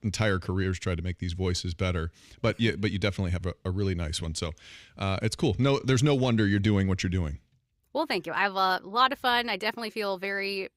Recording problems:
none

